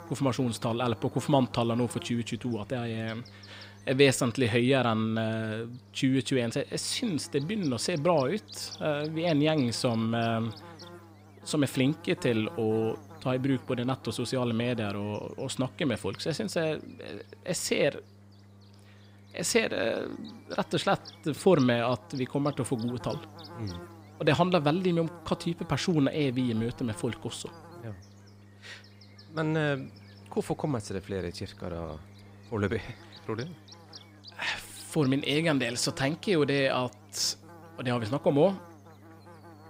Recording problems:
electrical hum; noticeable; throughout; 50 Hz, 20 dB below the speech

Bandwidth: 15.5 kHz